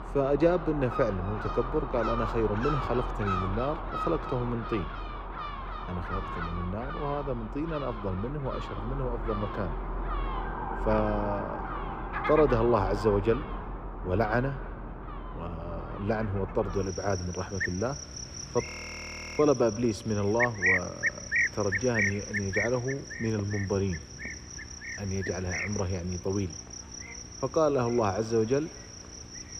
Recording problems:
muffled; slightly; fading above 3.5 kHz
echo of what is said; faint; throughout; 90 ms later, 25 dB below the speech
animal sounds; loud; throughout; 5 dB below the speech
electrical hum; faint; from 10 s on; 60 Hz, 25 dB below the speech
siren; noticeable; from 10 to 13 s; peak 7 dB below the speech
audio freezing; at 19 s for 0.5 s

